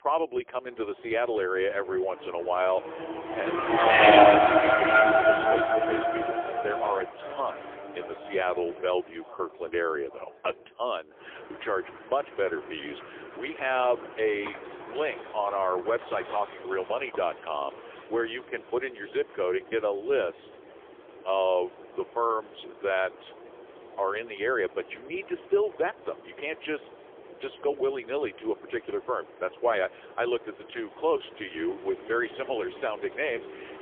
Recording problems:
phone-call audio; poor line; nothing above 3.5 kHz
traffic noise; very loud; throughout; 8 dB above the speech

